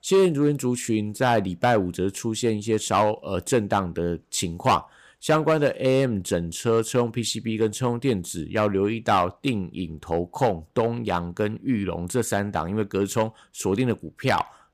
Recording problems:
none

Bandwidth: 15 kHz